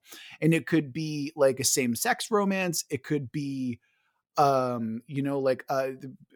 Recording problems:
none

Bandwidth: 19 kHz